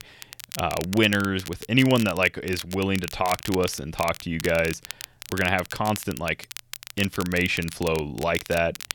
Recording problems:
crackle, like an old record; noticeable; 15 dB below the speech

